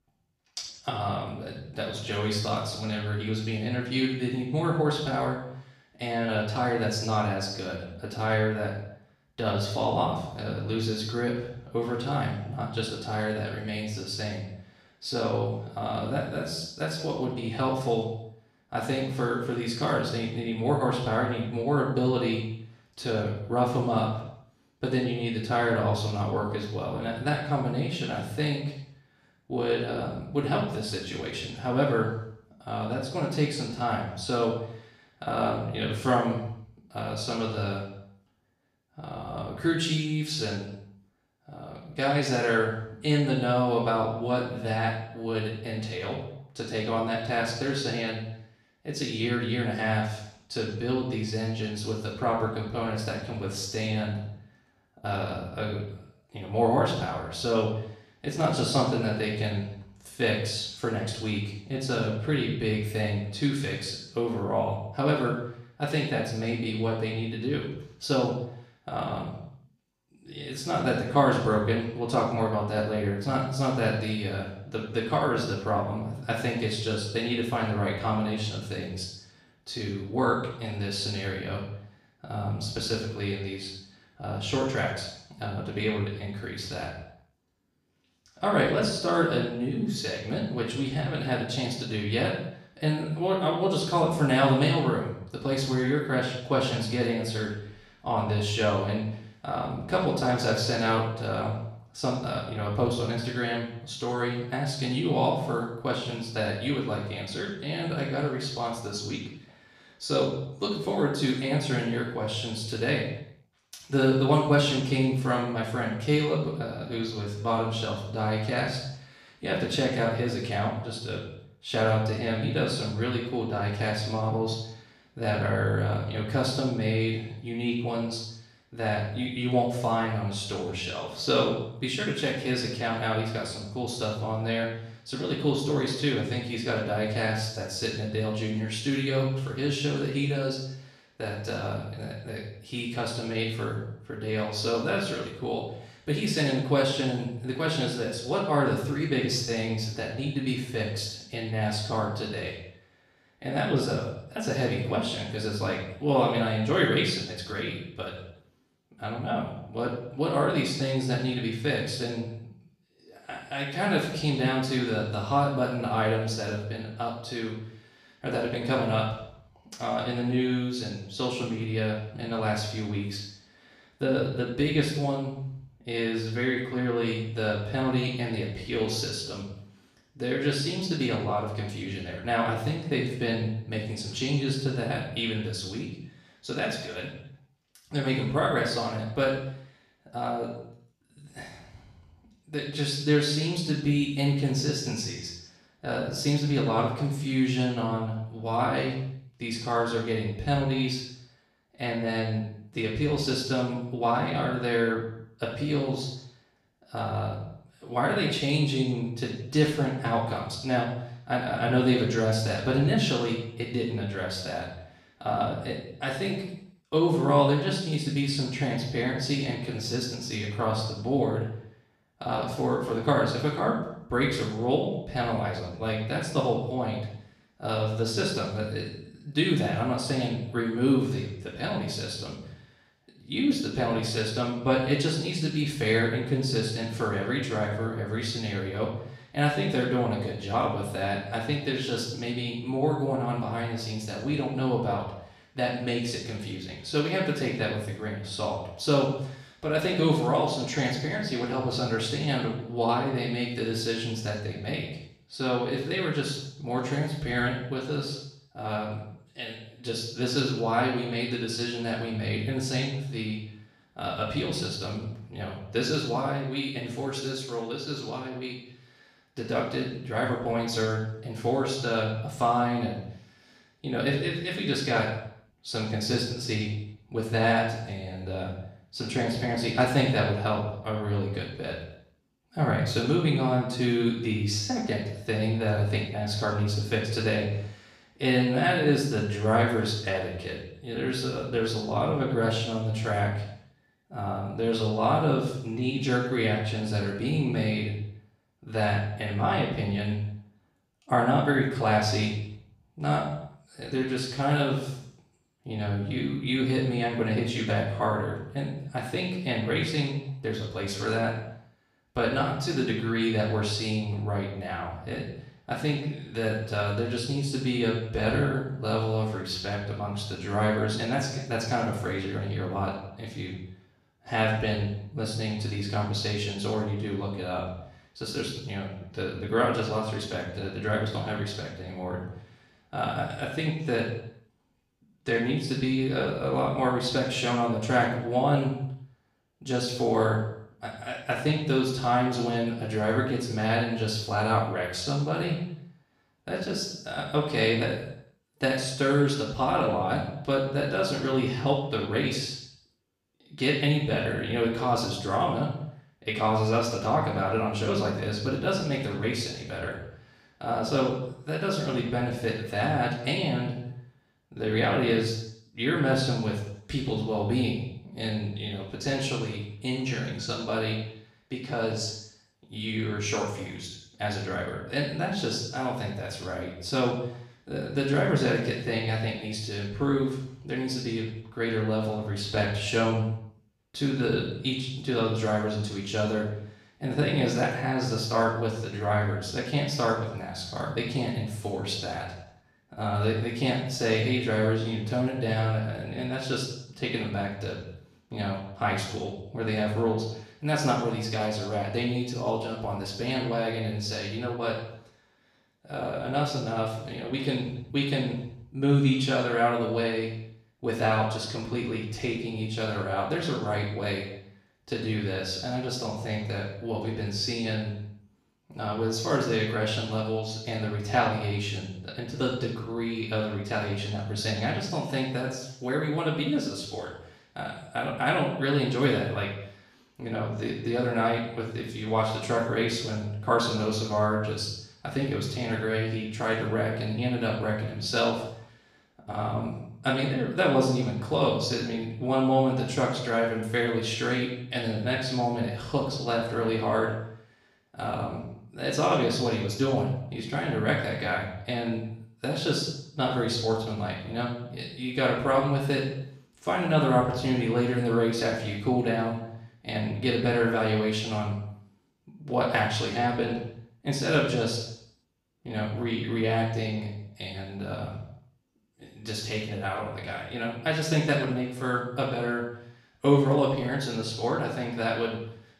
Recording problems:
off-mic speech; far
room echo; noticeable; dies away in 0.7 s

